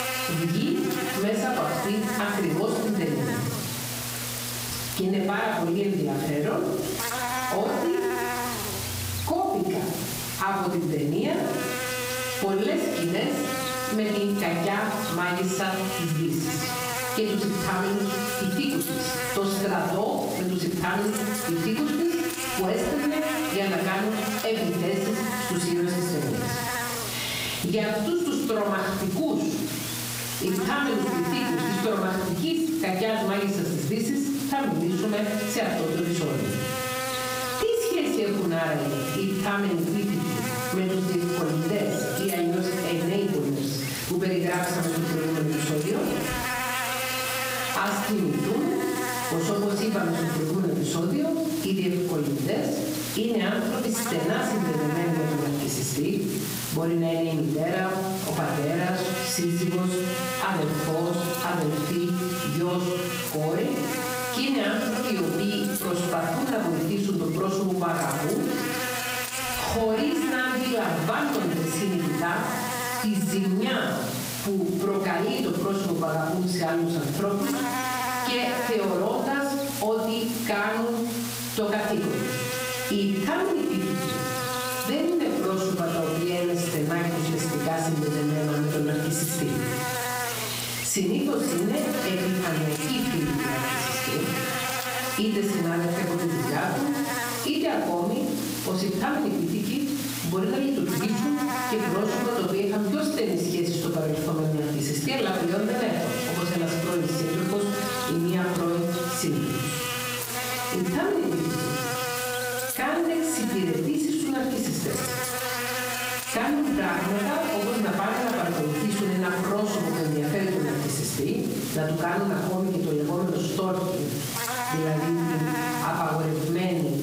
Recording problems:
off-mic speech; far
squashed, flat; heavily
room echo; noticeable; dies away in 0.7 s
electrical hum; loud; throughout; 60 Hz, 3 dB below the speech

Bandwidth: 15.5 kHz